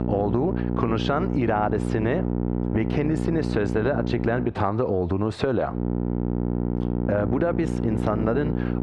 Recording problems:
muffled; slightly; fading above 2 kHz
squashed, flat; somewhat
electrical hum; loud; until 4.5 s and from 6 s on; 60 Hz, 7 dB below the speech

